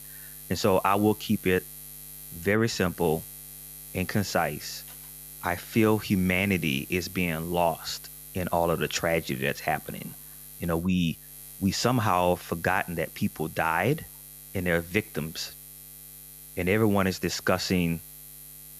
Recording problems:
electrical hum; noticeable; throughout; 60 Hz, 20 dB below the speech

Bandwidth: 14.5 kHz